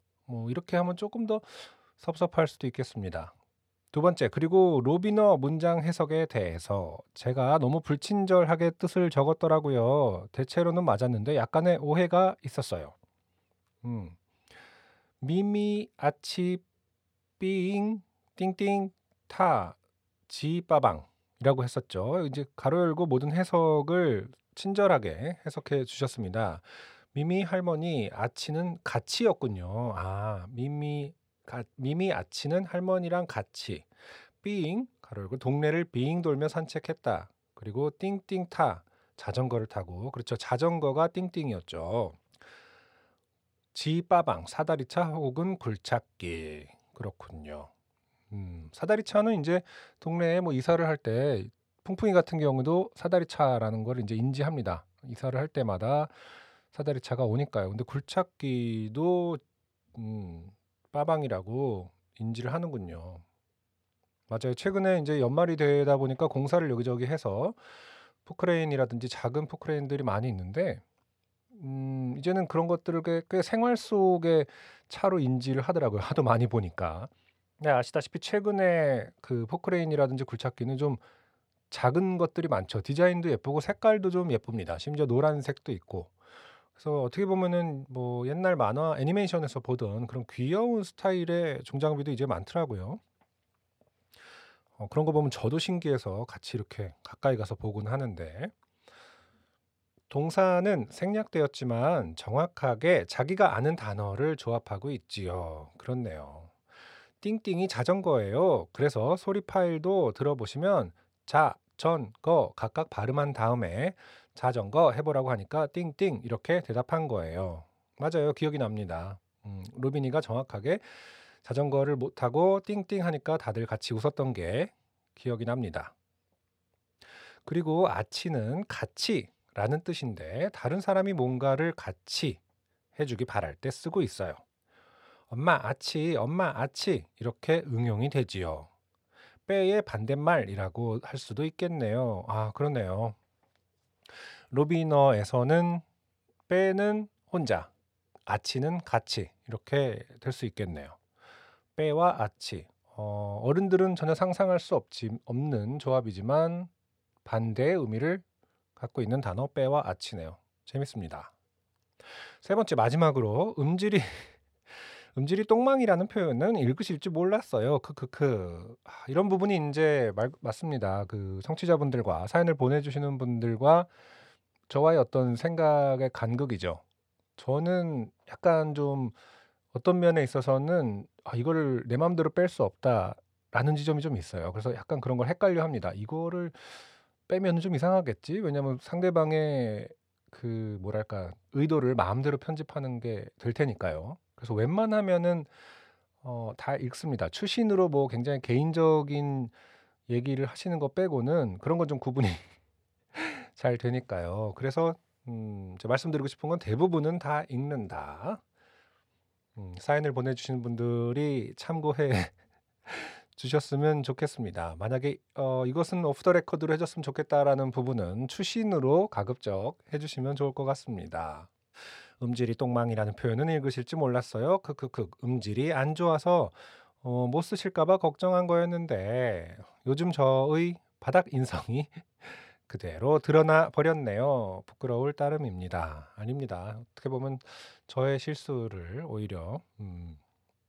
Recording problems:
none

